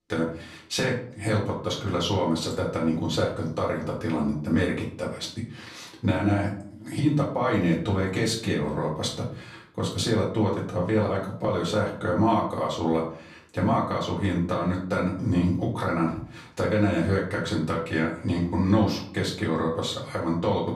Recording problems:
off-mic speech; far
room echo; slight; dies away in 0.4 s

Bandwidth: 14.5 kHz